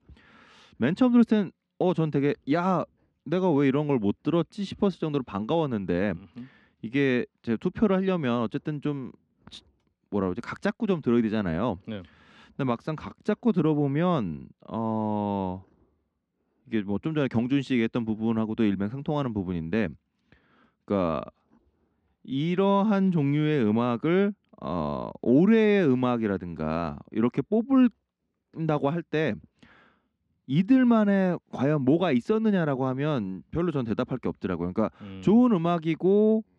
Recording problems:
muffled; slightly; fading above 3.5 kHz

